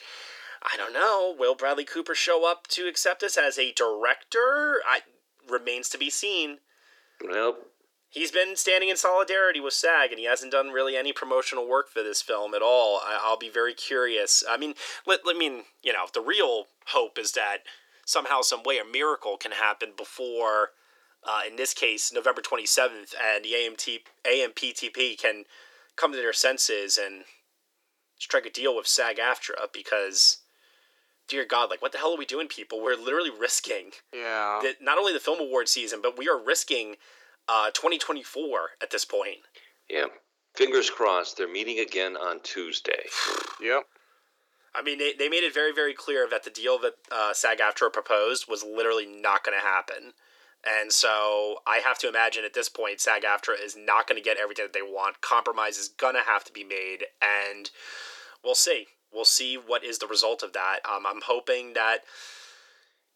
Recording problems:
thin; very; fading below 400 Hz

